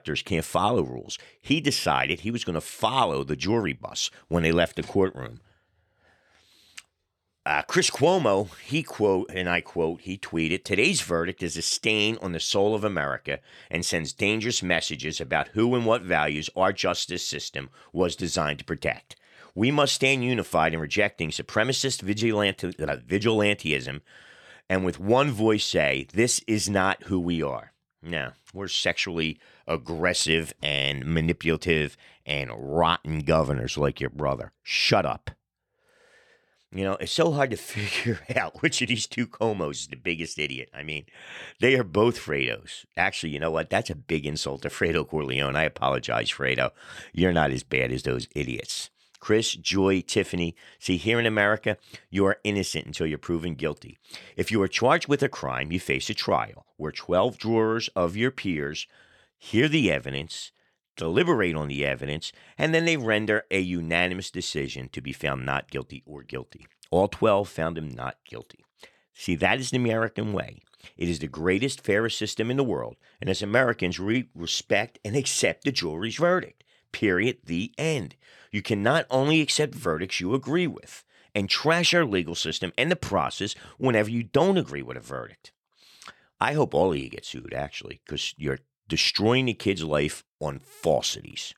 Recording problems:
none

